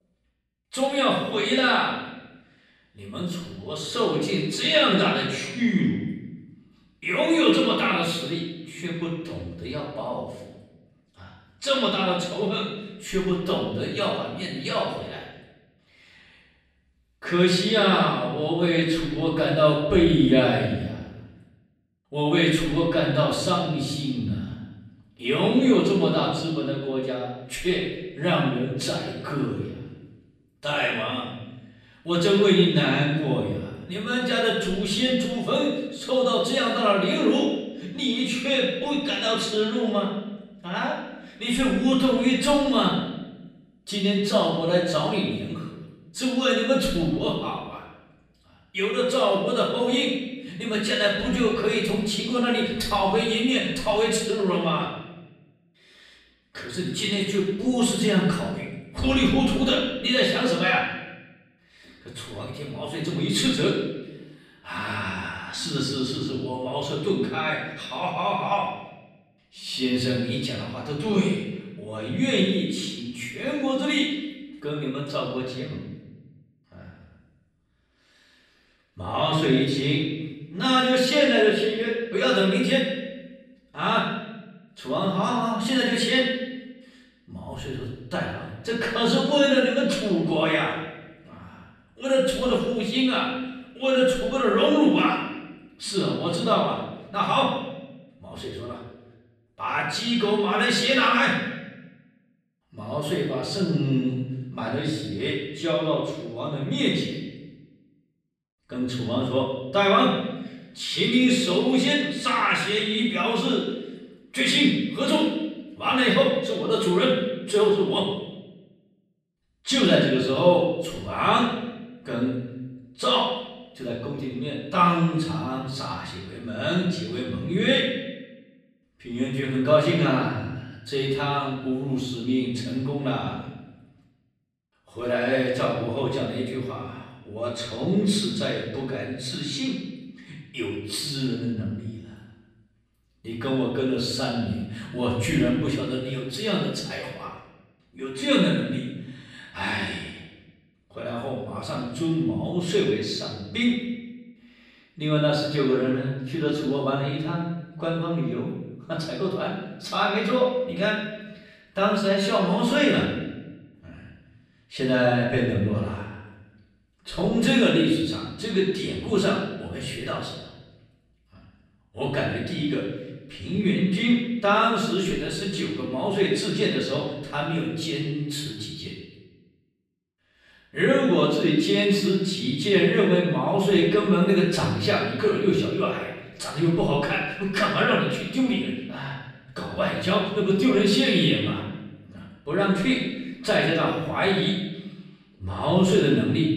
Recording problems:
off-mic speech; far
room echo; noticeable; dies away in 1 s

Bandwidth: 14.5 kHz